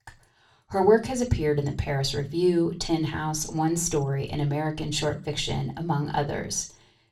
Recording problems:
off-mic speech; far
room echo; very slight; dies away in 0.3 s

